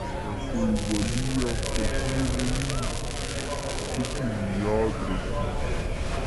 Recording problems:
wrong speed and pitch; too slow and too low; 0.6 times normal speed
murmuring crowd; loud; throughout; 3 dB below the speech
crackling; loud; from 1 to 4 s; 4 dB below the speech
low rumble; noticeable; throughout; 15 dB below the speech
hiss; faint; throughout; 20 dB below the speech

